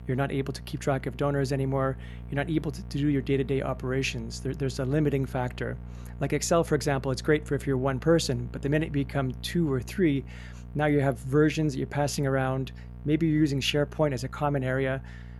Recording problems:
electrical hum; faint; throughout; 60 Hz, 25 dB below the speech

